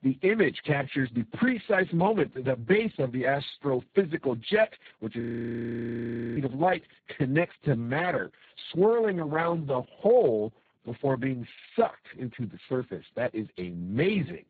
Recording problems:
garbled, watery; badly; nothing above 4 kHz
audio freezing; at 5 s for 1 s

